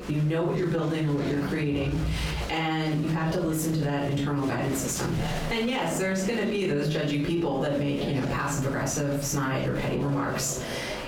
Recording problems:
off-mic speech; far
squashed, flat; heavily
room echo; slight; dies away in 0.6 s
chatter from many people; noticeable; throughout; 10 dB below the speech

